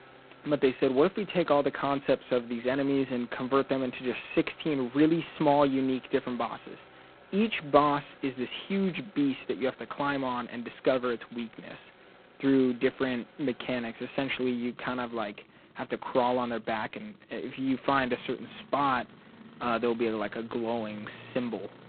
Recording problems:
phone-call audio; poor line; nothing above 4 kHz
traffic noise; faint; throughout; 25 dB below the speech

